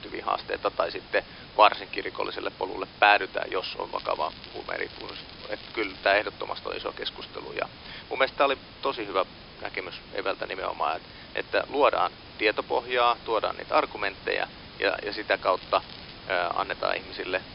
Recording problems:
thin; somewhat; fading below 300 Hz
high frequencies cut off; noticeable; nothing above 5.5 kHz
hiss; noticeable; throughout; 15 dB below the speech
crackling; noticeable; from 4 to 6 s and at 16 s; 15 dB below the speech

